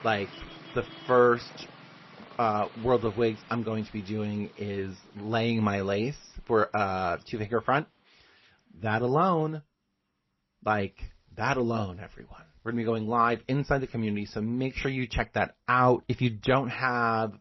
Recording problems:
garbled, watery; slightly; nothing above 6 kHz
traffic noise; faint; throughout; 20 dB below the speech

